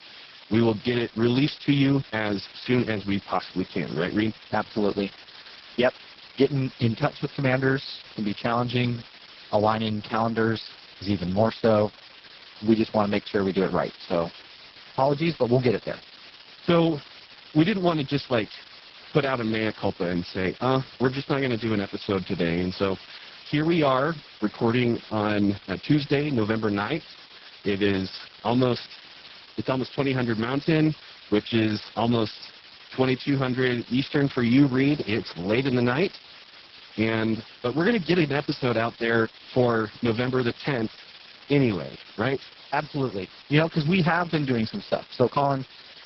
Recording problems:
garbled, watery; badly; nothing above 5.5 kHz
hiss; noticeable; throughout; 20 dB below the speech

